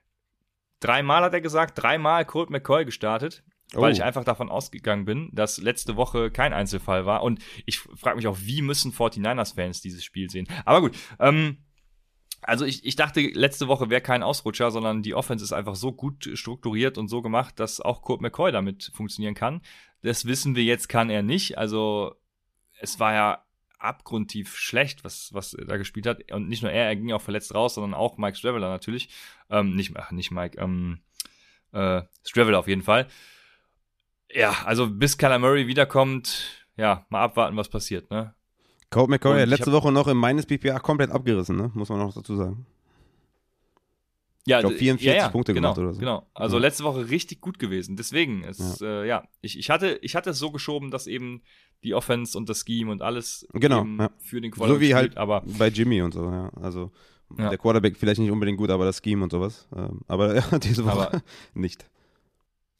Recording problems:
none

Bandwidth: 14.5 kHz